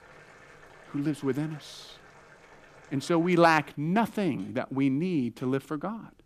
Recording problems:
household noises; faint; throughout; 25 dB below the speech

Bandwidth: 14.5 kHz